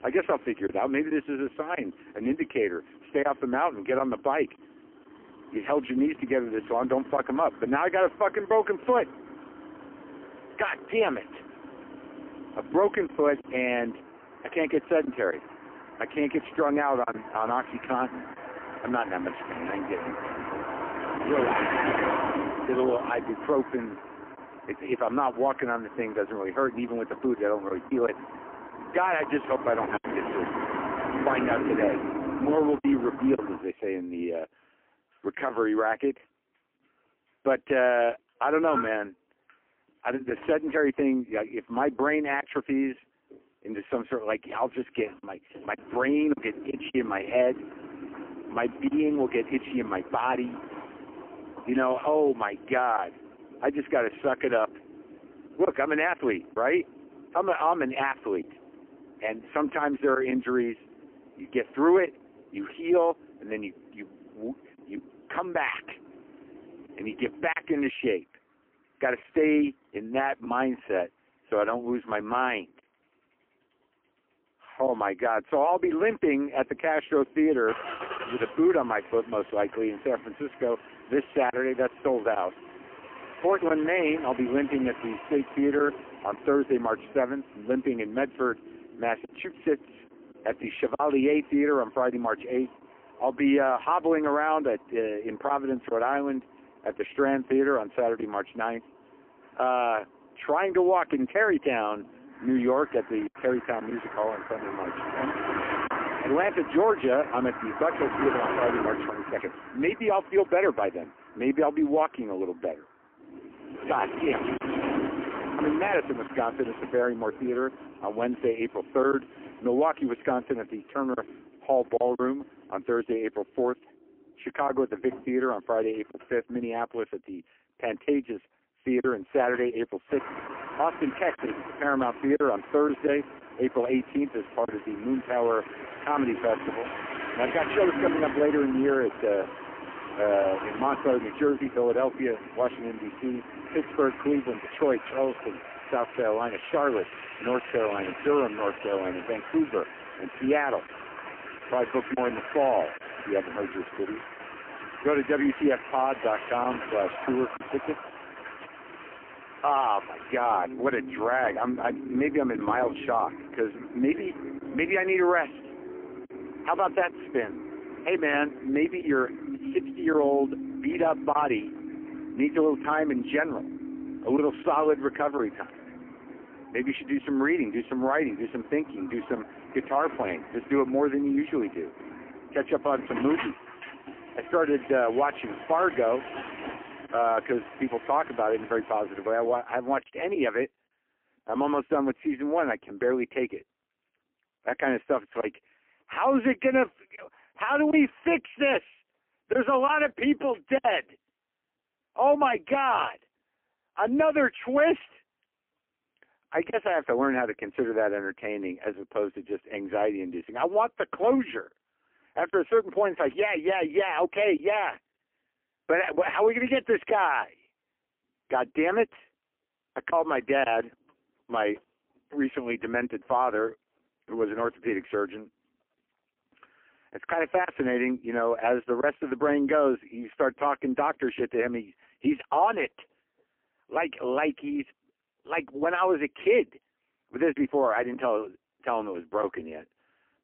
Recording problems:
phone-call audio; poor line; nothing above 3 kHz
traffic noise; noticeable; until 3:09; 10 dB below the speech
choppy; occasionally; 1% of the speech affected

